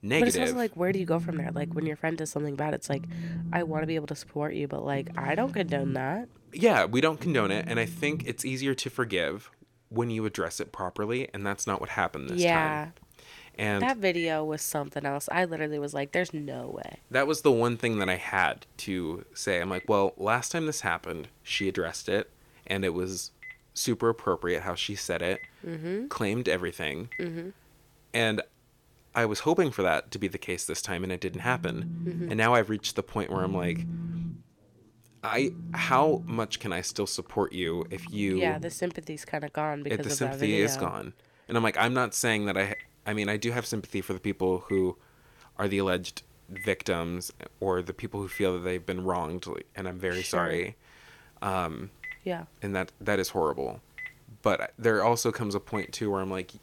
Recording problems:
alarms or sirens; noticeable; throughout; 10 dB below the speech

